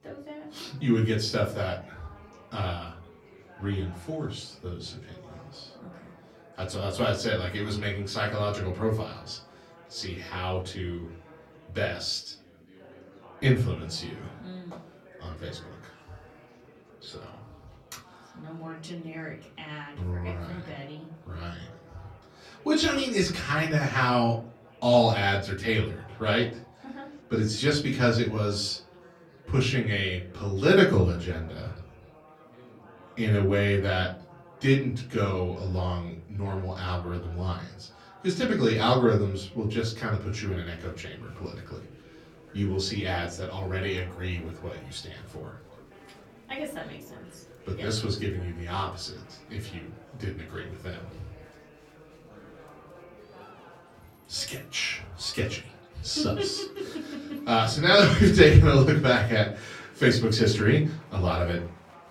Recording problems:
off-mic speech; far
room echo; very slight; dies away in 0.4 s
chatter from many people; faint; throughout; 25 dB below the speech

